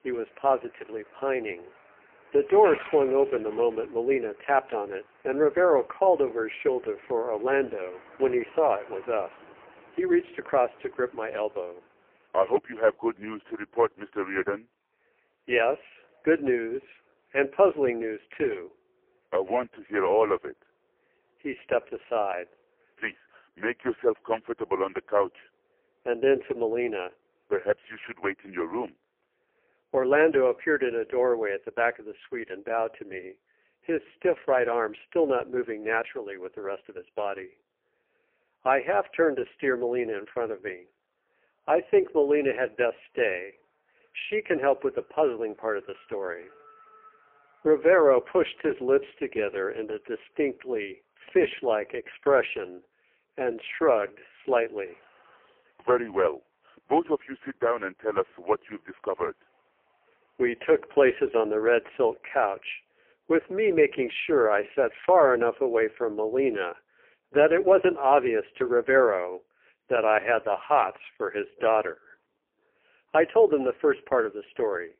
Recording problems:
phone-call audio; poor line
traffic noise; faint; throughout; 25 dB below the speech

